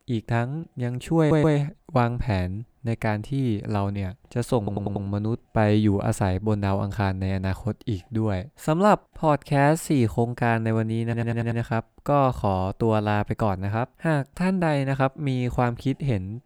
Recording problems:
audio stuttering; at 1 s, at 4.5 s and at 11 s

